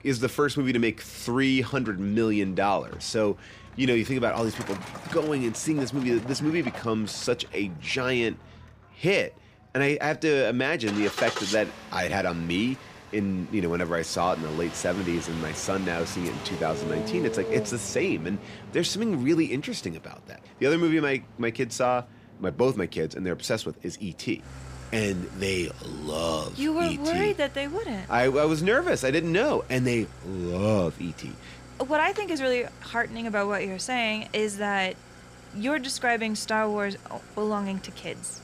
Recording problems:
traffic noise; noticeable; throughout; 15 dB below the speech

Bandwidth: 15 kHz